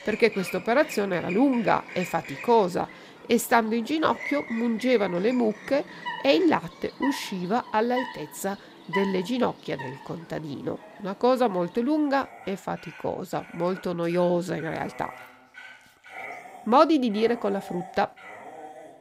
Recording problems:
animal sounds; noticeable; throughout; 15 dB below the speech

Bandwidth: 15.5 kHz